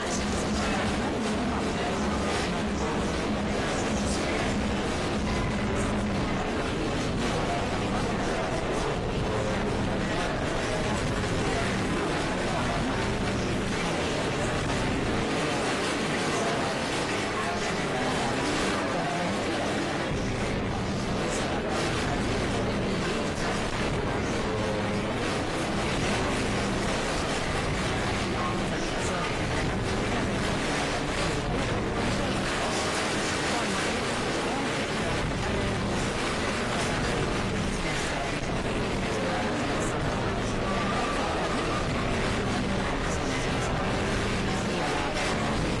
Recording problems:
distortion; heavy; 7 dB below the speech
garbled, watery; slightly; nothing above 10.5 kHz
crowd noise; very loud; throughout; 4 dB above the speech
murmuring crowd; very loud; throughout; 5 dB above the speech
low rumble; very loud; from 4.5 to 15 s, from 20 to 33 s and from 35 s on; as loud as the speech
uneven, jittery; strongly; from 1 to 39 s

